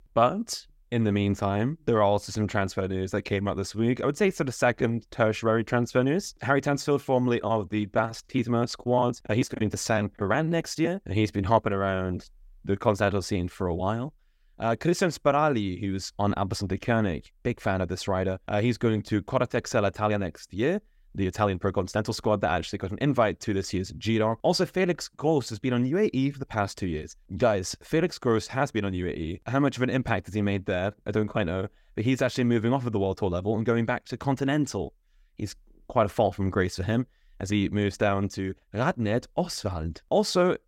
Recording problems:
none

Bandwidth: 16 kHz